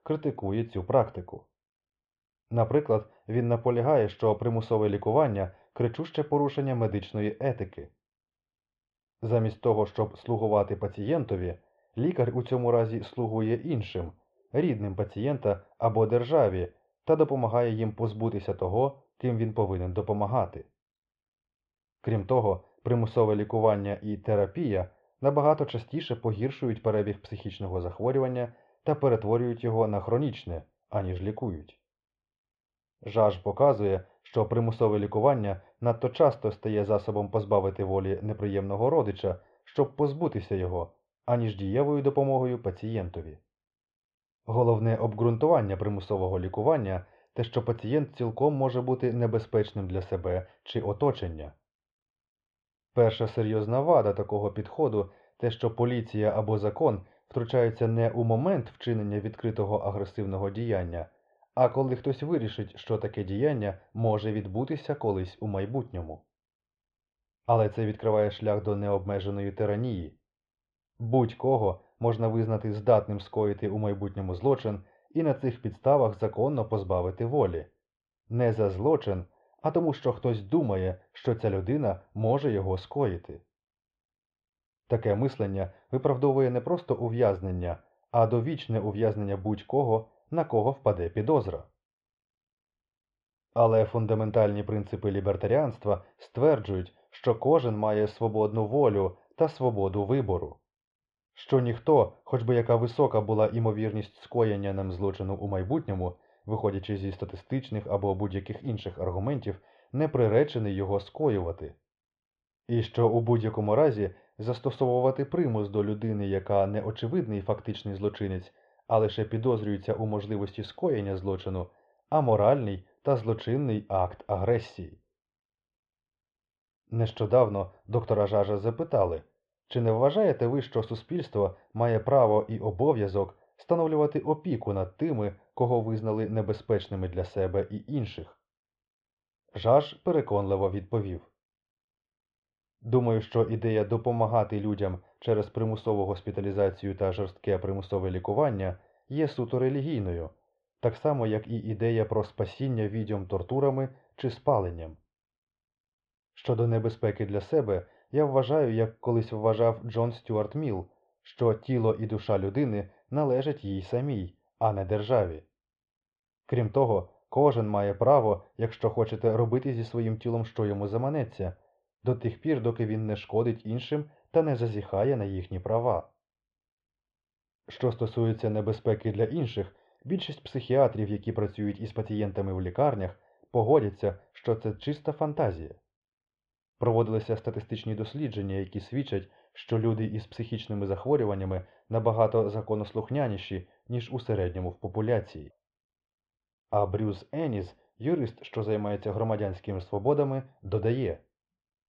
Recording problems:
muffled; very; fading above 3 kHz

